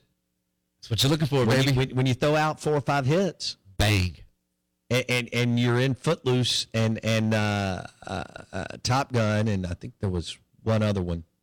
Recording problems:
distortion; heavy; 9% of the sound clipped

